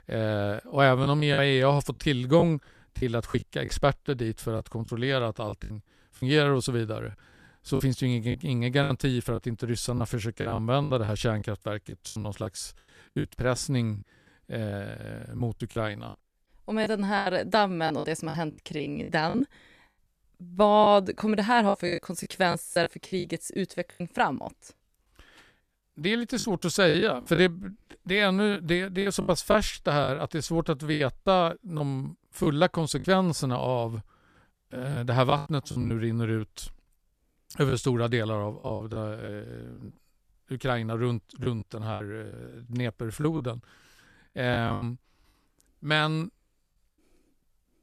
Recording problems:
choppy; very; 9% of the speech affected

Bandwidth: 14 kHz